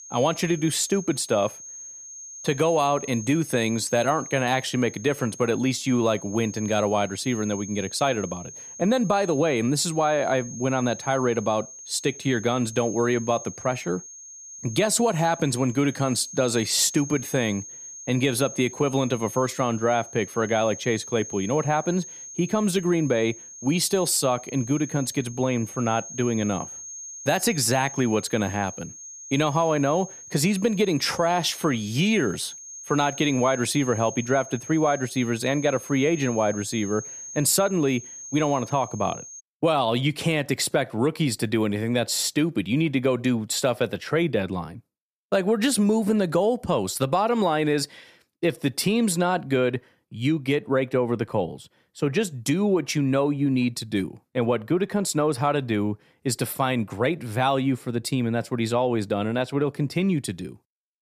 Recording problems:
high-pitched whine; noticeable; until 39 s; 6.5 kHz, 15 dB below the speech

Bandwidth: 14.5 kHz